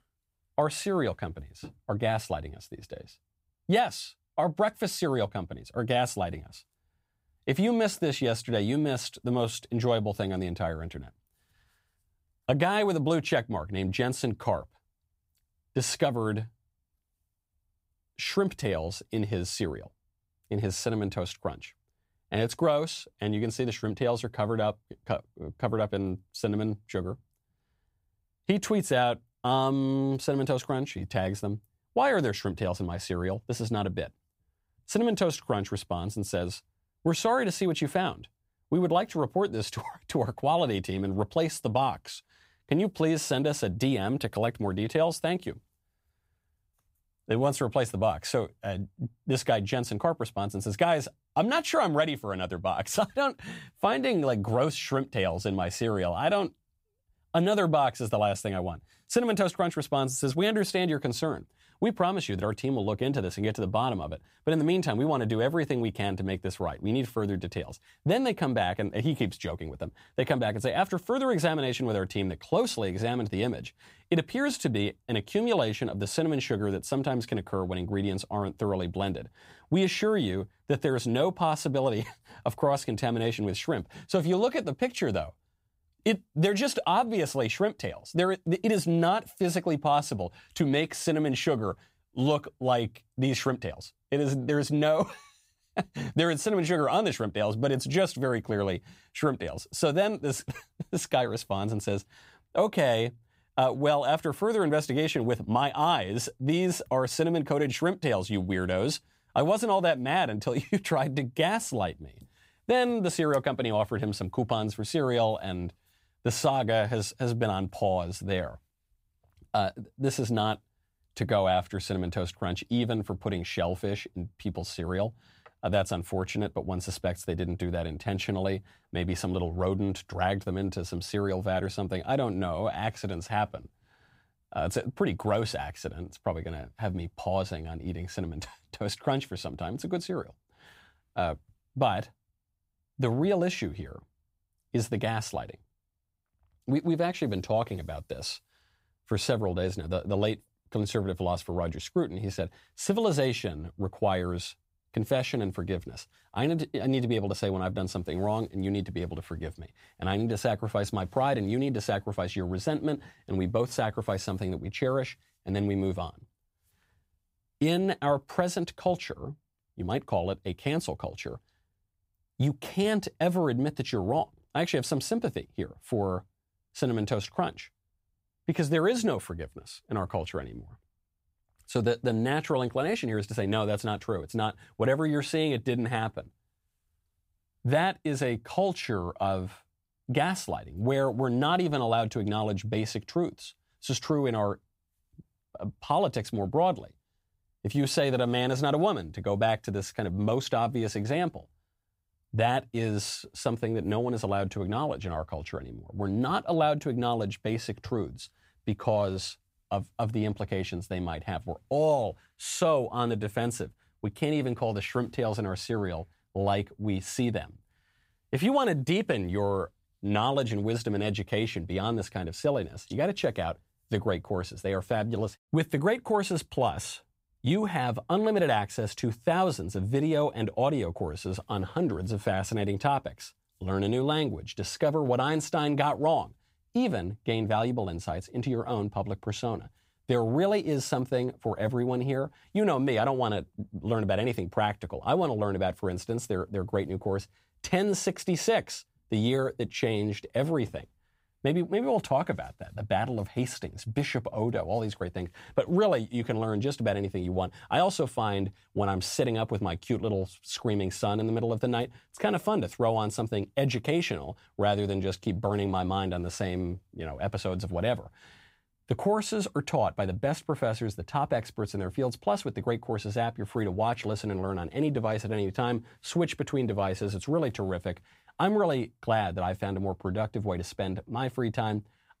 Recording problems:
none

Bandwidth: 15.5 kHz